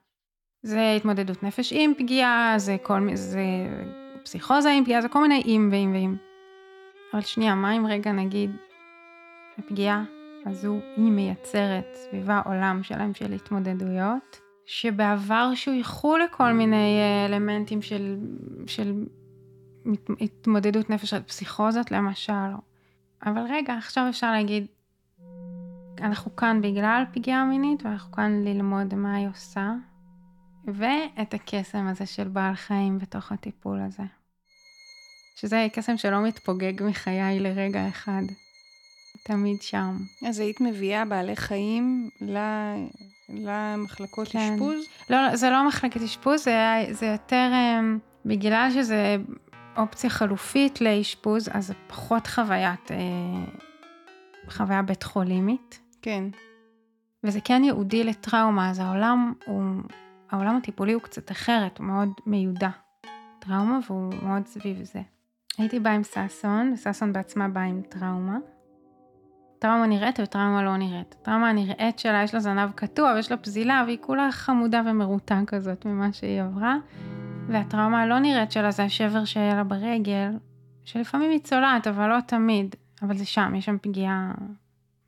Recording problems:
background music; faint; throughout; 20 dB below the speech

